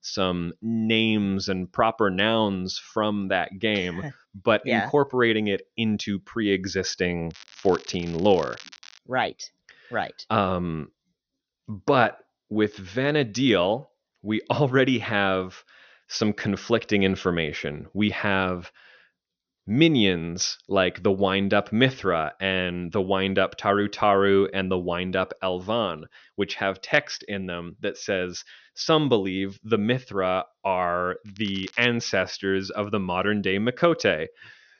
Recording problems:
high frequencies cut off; noticeable; nothing above 6 kHz
crackling; faint; from 7.5 to 9 s and at 31 s; 20 dB below the speech

